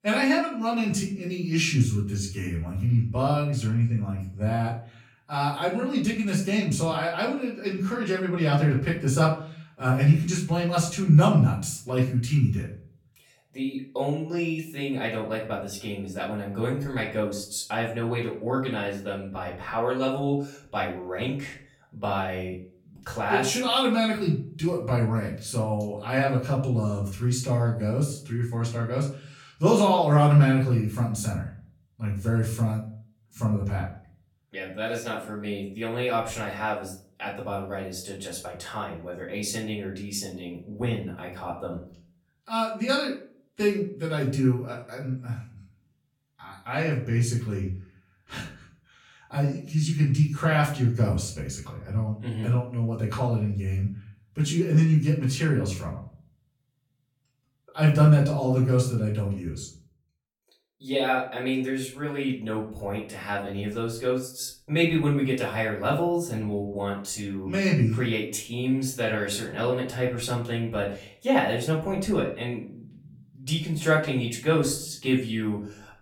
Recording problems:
off-mic speech; far
room echo; slight; dies away in 0.4 s

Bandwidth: 17 kHz